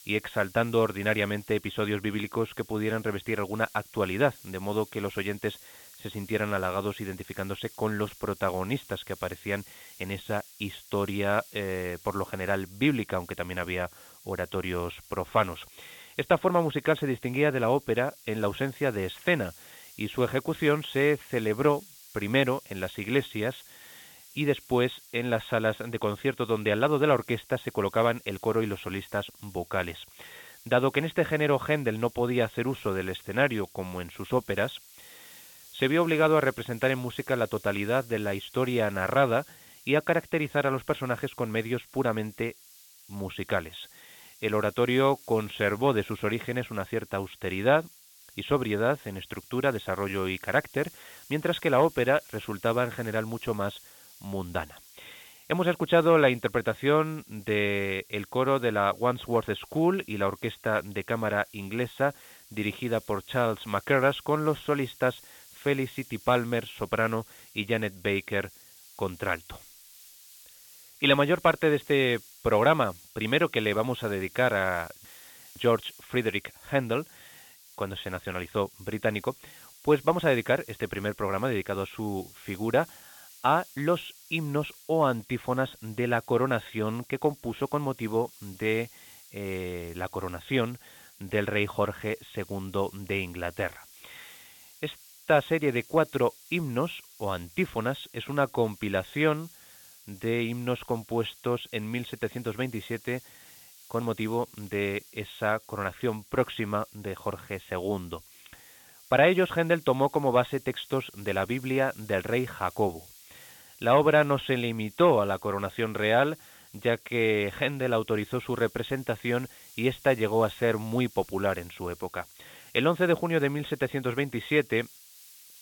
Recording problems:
high frequencies cut off; severe; nothing above 4 kHz
hiss; faint; throughout; 20 dB below the speech

